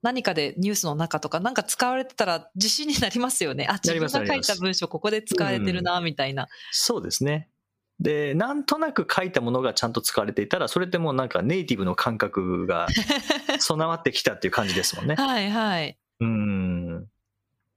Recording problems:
squashed, flat; somewhat

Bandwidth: 15 kHz